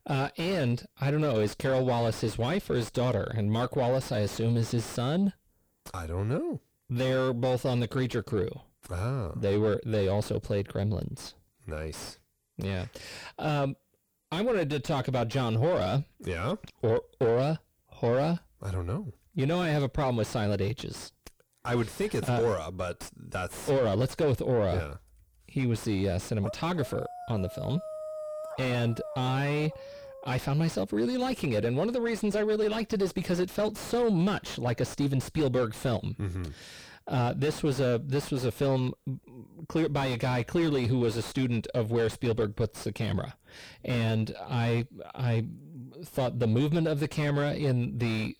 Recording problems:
distortion; heavy; 6 dB below the speech
dog barking; noticeable; from 26 to 31 s; peak 8 dB below the speech

